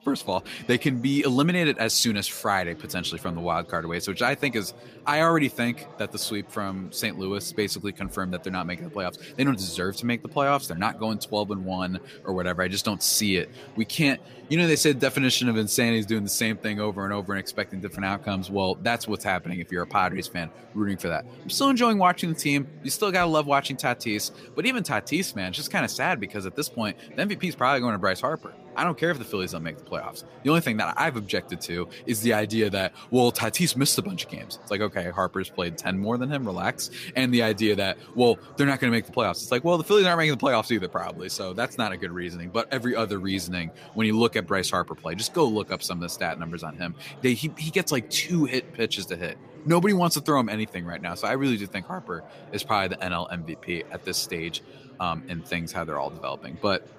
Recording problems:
chatter from many people; faint; throughout; 20 dB below the speech

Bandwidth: 15 kHz